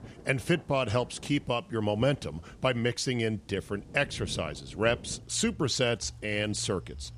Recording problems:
rain or running water; noticeable; throughout; 20 dB below the speech

